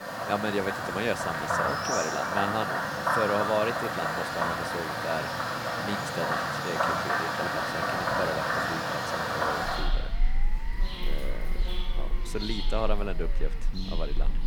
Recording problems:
animal sounds; very loud; throughout; 4 dB above the speech
siren; faint; from 9.5 to 14 s; peak 20 dB below the speech

